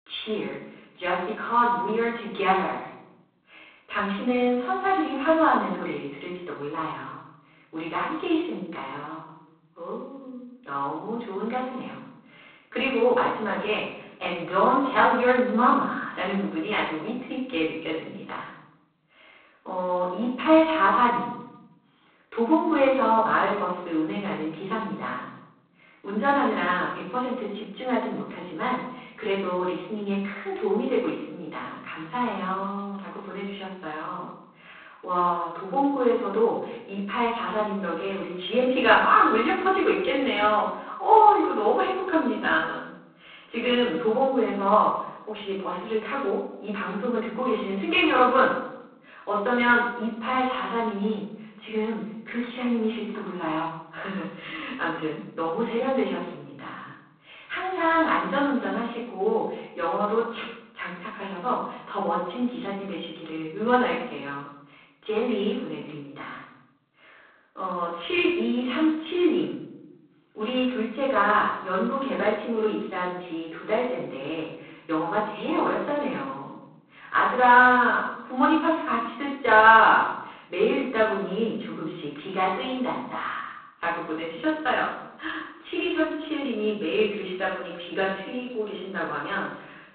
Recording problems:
phone-call audio; poor line
off-mic speech; far
room echo; noticeable; dies away in 0.8 s

